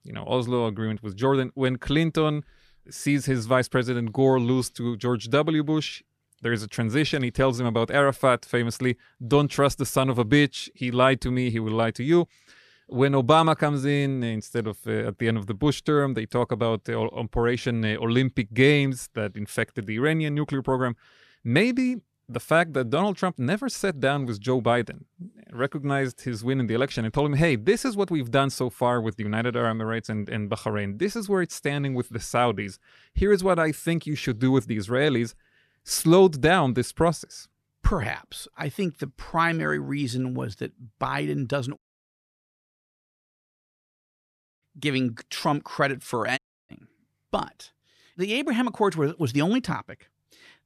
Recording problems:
audio cutting out; at 42 s for 3 s and at 46 s

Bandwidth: 14 kHz